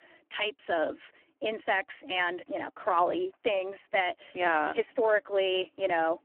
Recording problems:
phone-call audio; poor line; nothing above 3 kHz

